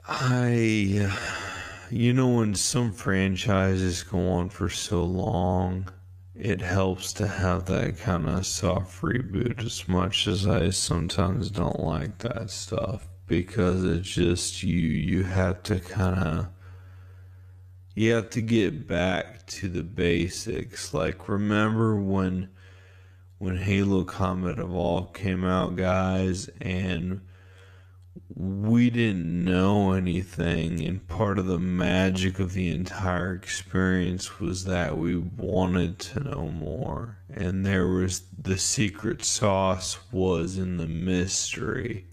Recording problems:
wrong speed, natural pitch; too slow; 0.5 times normal speed

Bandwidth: 14.5 kHz